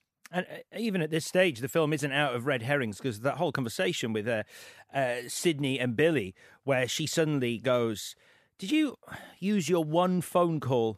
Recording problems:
none

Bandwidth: 14.5 kHz